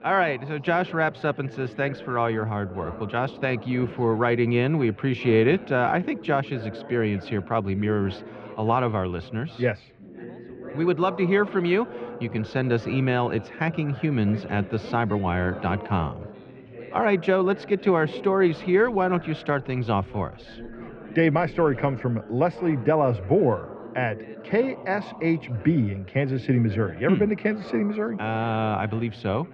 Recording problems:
muffled; very; fading above 2.5 kHz
background chatter; noticeable; throughout; 4 voices, 15 dB below the speech

